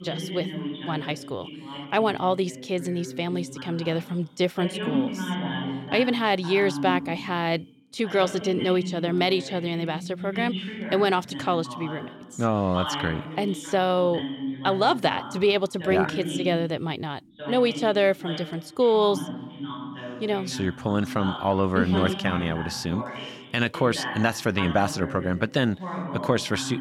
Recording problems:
voice in the background; loud; throughout; 9 dB below the speech

